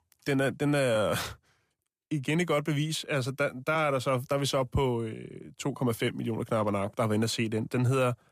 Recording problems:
none

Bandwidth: 15 kHz